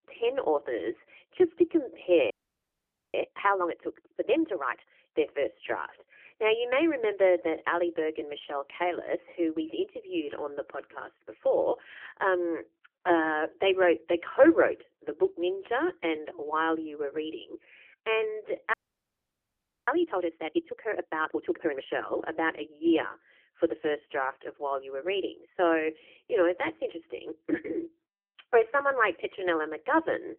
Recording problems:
phone-call audio; poor line; nothing above 3 kHz
audio freezing; at 2.5 s for 1 s and at 19 s for 1 s

